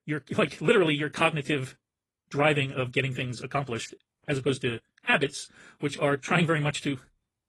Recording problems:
wrong speed, natural pitch; too fast; 1.6 times normal speed
garbled, watery; slightly

